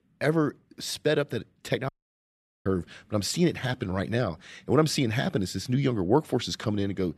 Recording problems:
audio cutting out; at 2 s for 1 s

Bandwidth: 14 kHz